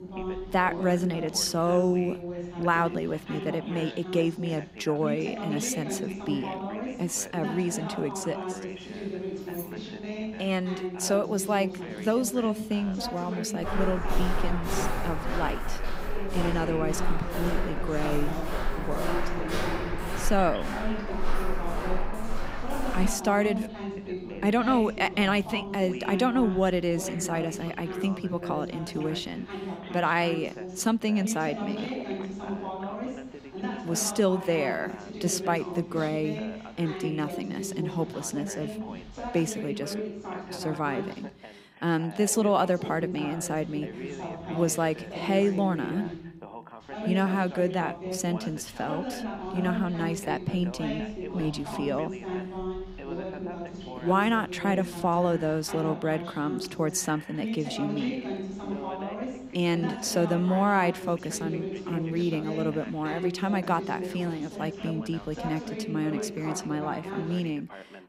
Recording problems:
background chatter; loud; throughout; 2 voices, 7 dB below the speech
jangling keys; faint; at 9.5 s; peak 15 dB below the speech
footsteps; noticeable; from 14 to 23 s; peak 2 dB below the speech

